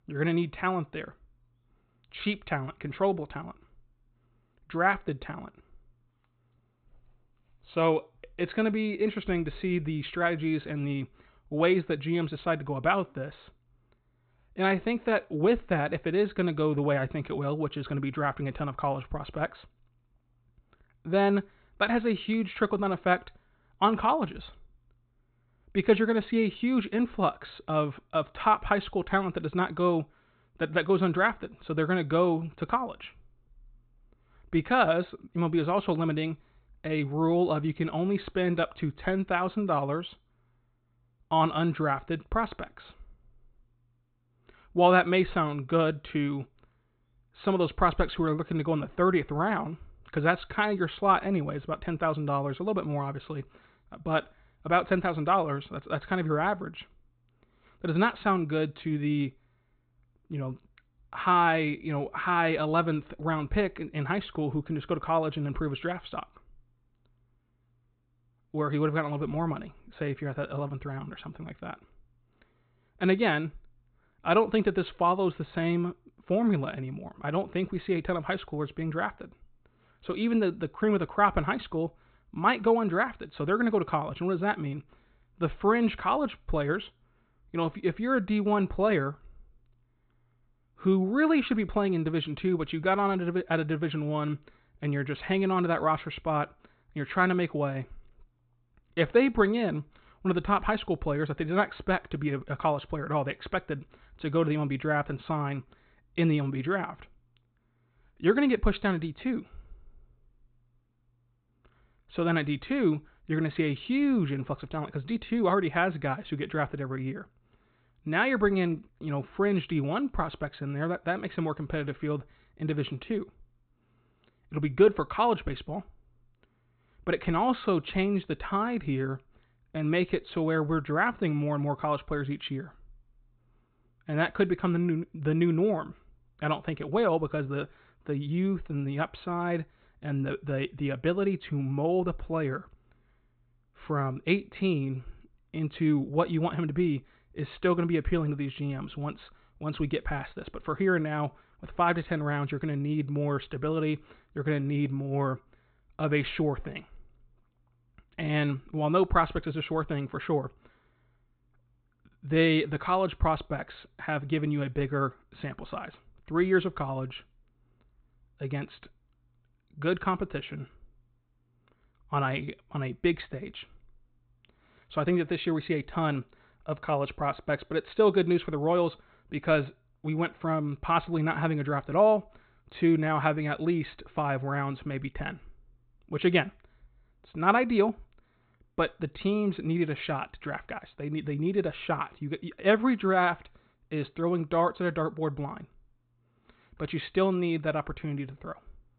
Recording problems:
high frequencies cut off; severe; nothing above 4 kHz

